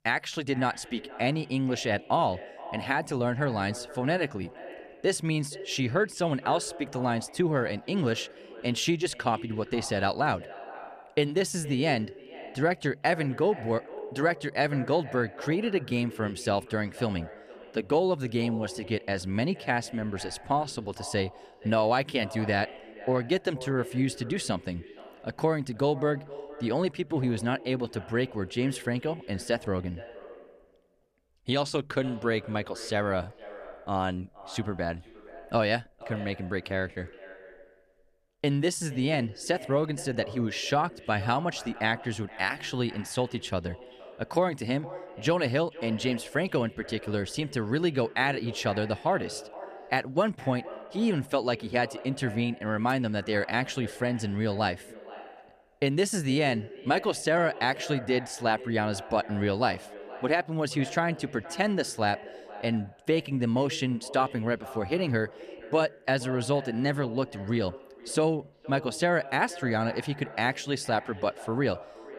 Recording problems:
echo of what is said; noticeable; throughout; 470 ms later, 15 dB below the speech

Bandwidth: 14.5 kHz